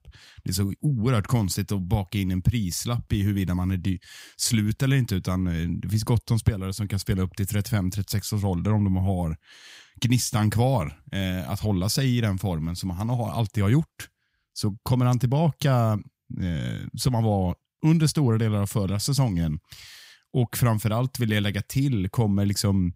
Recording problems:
none

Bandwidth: 15.5 kHz